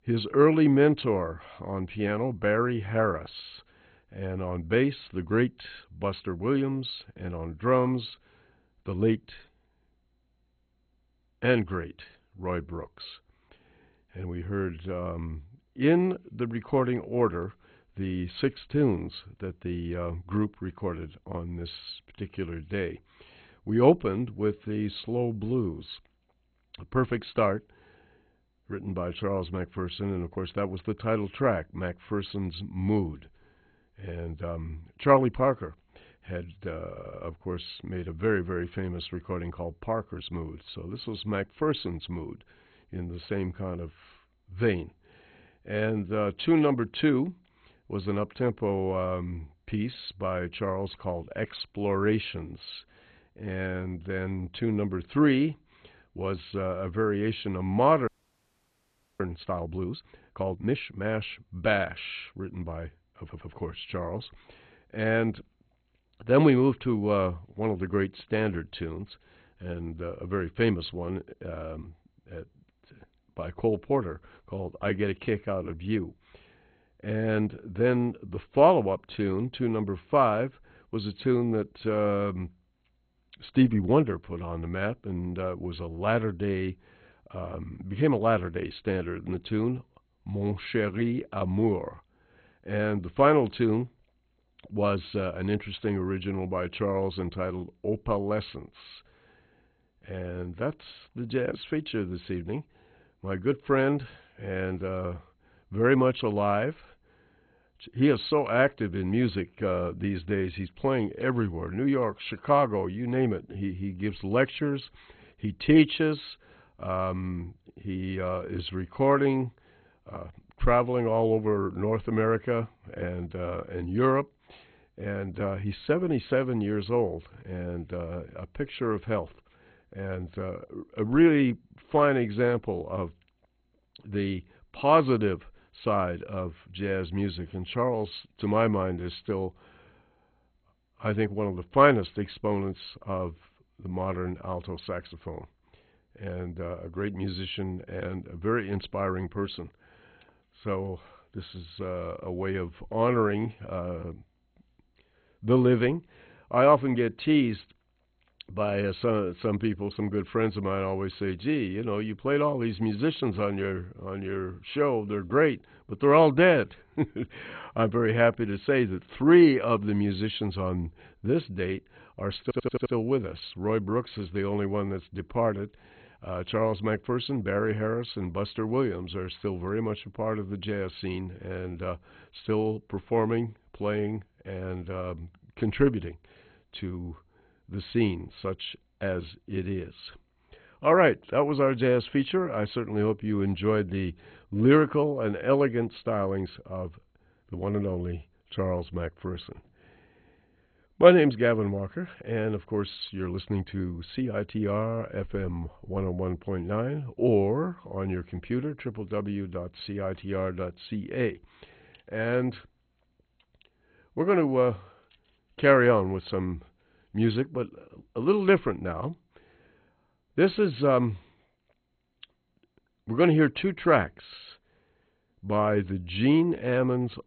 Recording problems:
garbled, watery; badly; nothing above 4 kHz
audio stuttering; at 37 s, at 1:03 and at 2:52
audio freezing; at 58 s for 1 s

